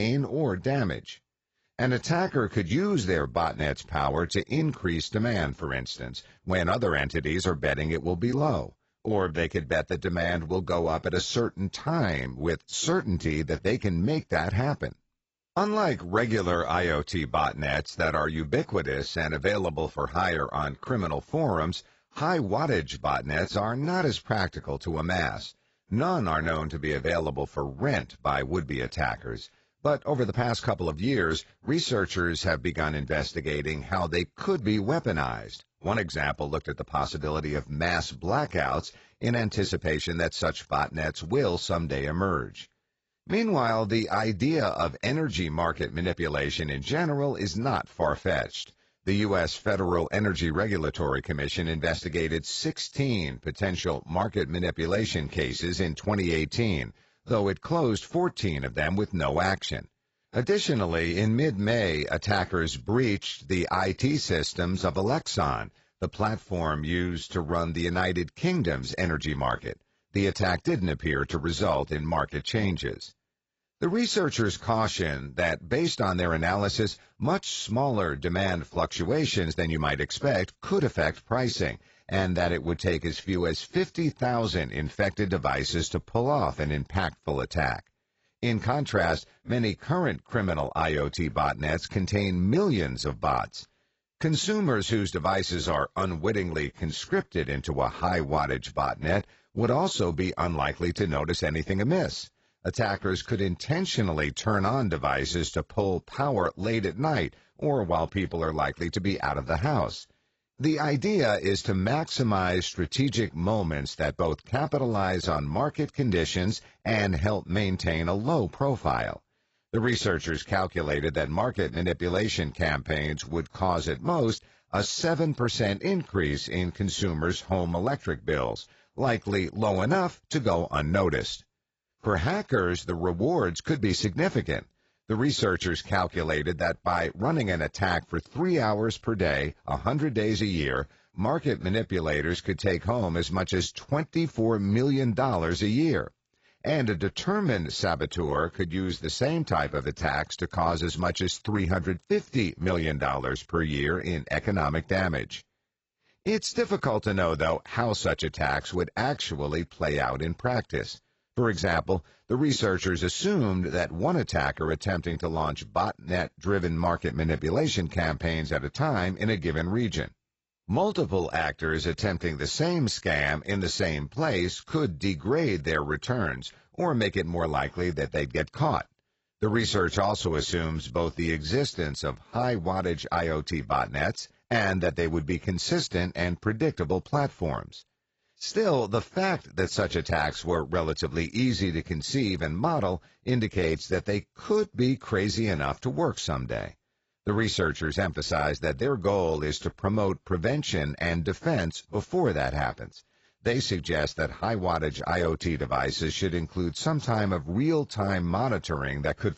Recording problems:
garbled, watery; badly; nothing above 7.5 kHz
abrupt cut into speech; at the start

